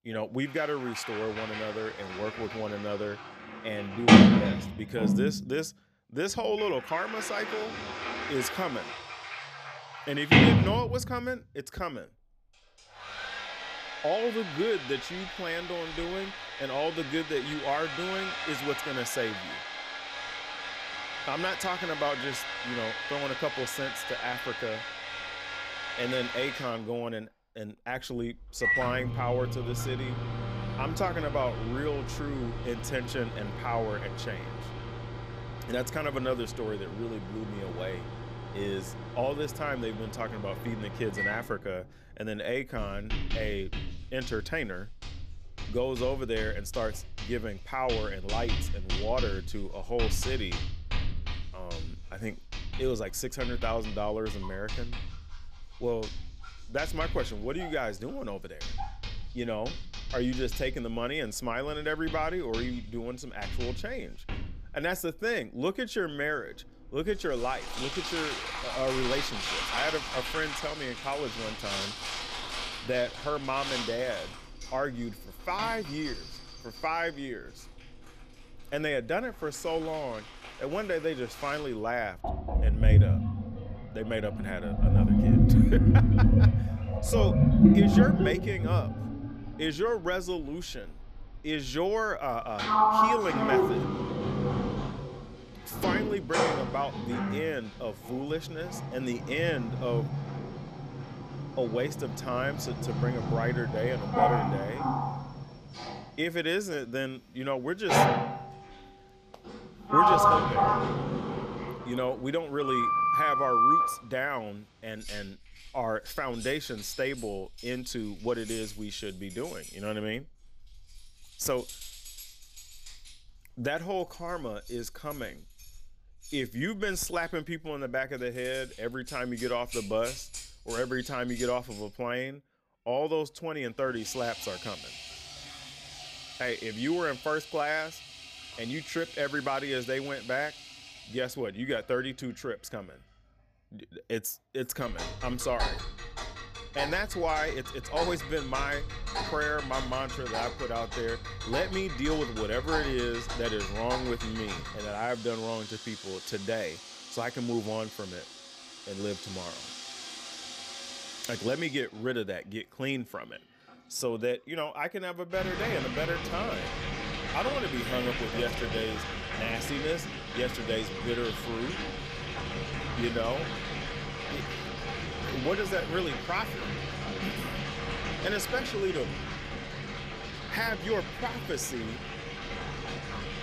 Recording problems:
household noises; very loud; throughout; 2 dB above the speech

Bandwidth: 14.5 kHz